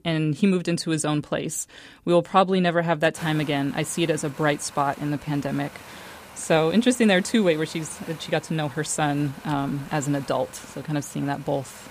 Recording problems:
wind noise on the microphone; occasional gusts; from 3 s on; 15 dB below the speech

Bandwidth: 15 kHz